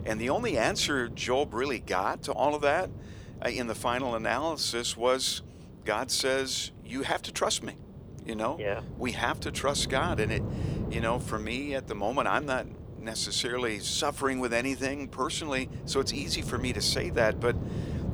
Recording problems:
thin; somewhat; fading below 500 Hz
wind noise on the microphone; occasional gusts; 20 dB below the speech

